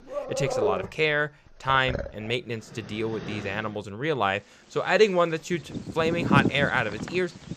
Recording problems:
animal sounds; loud; throughout; 5 dB below the speech

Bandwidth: 14.5 kHz